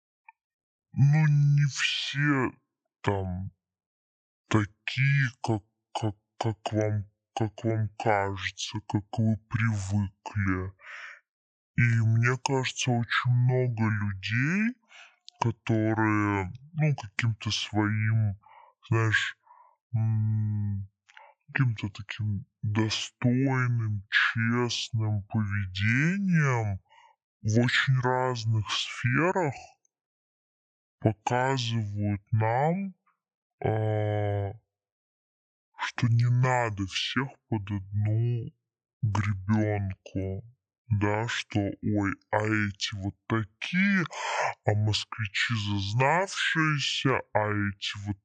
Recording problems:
wrong speed and pitch; too slow and too low; 0.6 times normal speed

